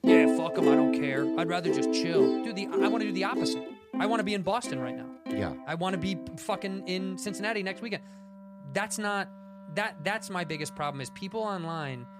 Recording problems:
background music; very loud; throughout; 4 dB above the speech

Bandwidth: 14.5 kHz